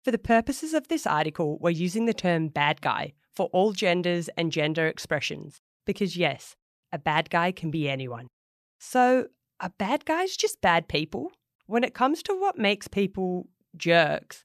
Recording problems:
none

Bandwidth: 14.5 kHz